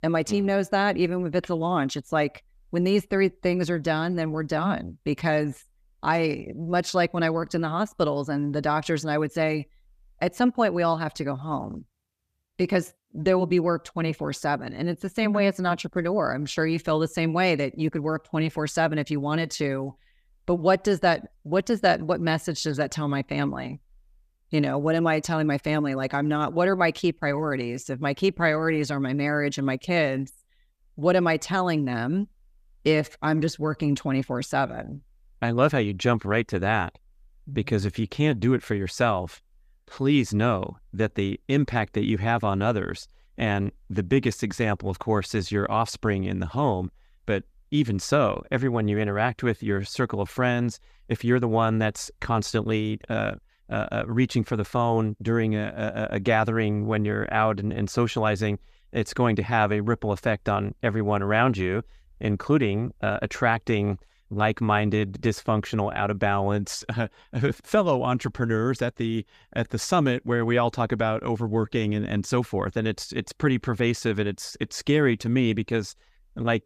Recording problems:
none

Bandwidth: 14.5 kHz